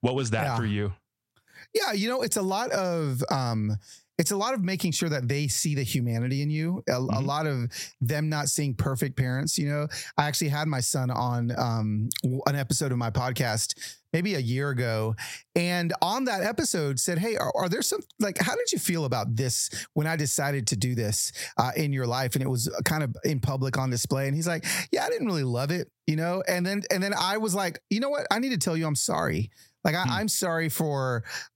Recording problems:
squashed, flat; somewhat

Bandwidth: 16.5 kHz